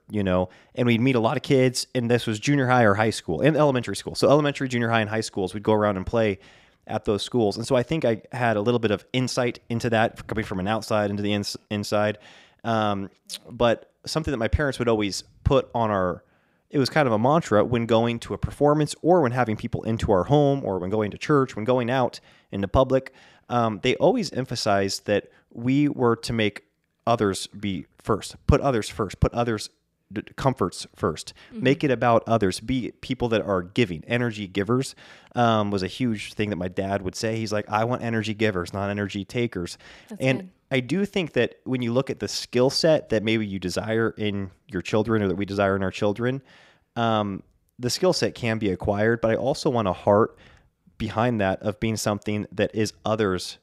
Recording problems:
none

